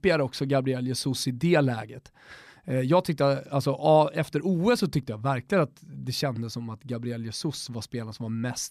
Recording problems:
none

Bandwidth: 14 kHz